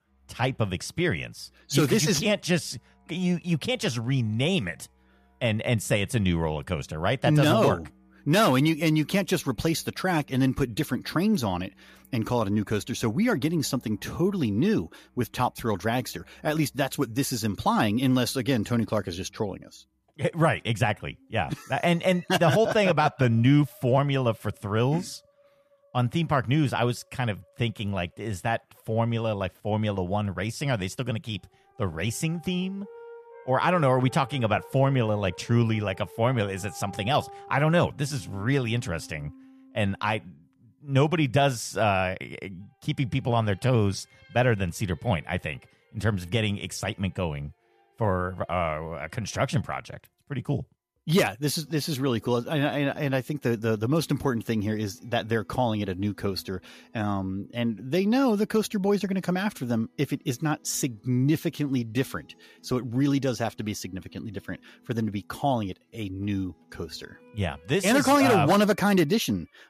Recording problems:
background music; faint; throughout; 30 dB below the speech

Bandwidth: 14.5 kHz